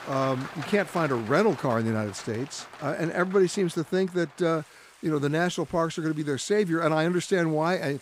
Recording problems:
rain or running water; noticeable; throughout; 20 dB below the speech

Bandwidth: 15.5 kHz